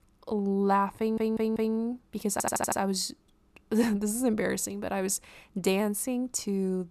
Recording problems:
audio stuttering; at 1 s and at 2.5 s

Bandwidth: 13.5 kHz